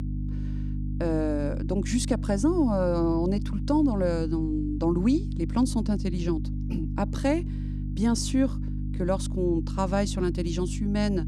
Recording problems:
electrical hum; noticeable; throughout; 50 Hz, 15 dB below the speech

